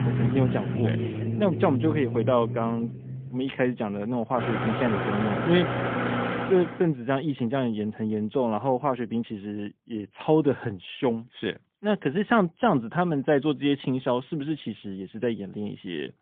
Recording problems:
phone-call audio; poor line; nothing above 3.5 kHz
traffic noise; loud; until 6.5 s; 2 dB below the speech

